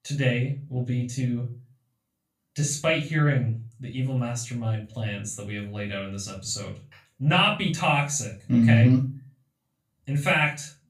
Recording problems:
off-mic speech; far
room echo; slight; dies away in 0.3 s

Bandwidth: 15 kHz